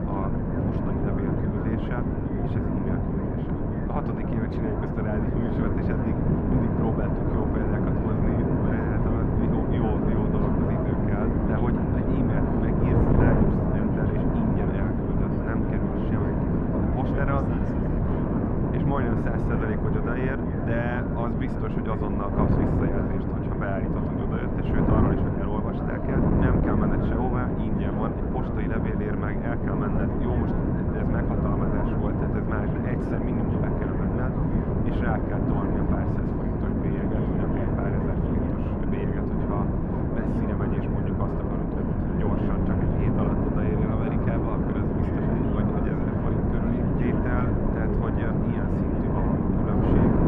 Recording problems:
muffled; very; fading above 4 kHz
wind noise on the microphone; heavy; 4 dB above the speech
background chatter; loud; throughout; 3 voices, 6 dB below the speech

